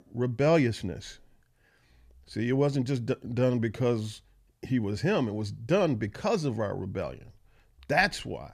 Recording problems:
none

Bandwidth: 14.5 kHz